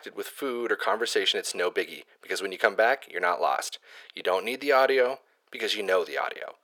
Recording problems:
thin; very; fading below 450 Hz

